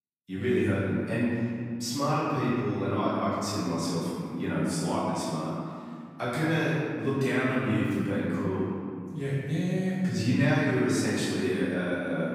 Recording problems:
room echo; strong; dies away in 2.1 s
off-mic speech; far

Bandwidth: 15.5 kHz